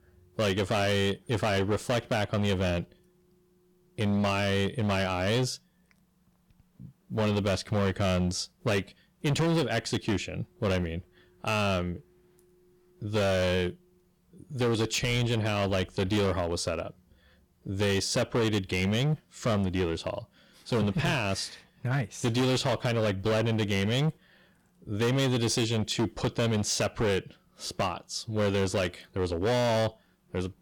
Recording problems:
distortion; heavy; 14% of the sound clipped

